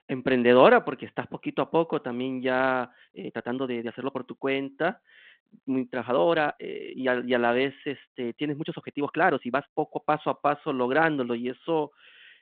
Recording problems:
phone-call audio
uneven, jittery; strongly; from 3 to 10 s

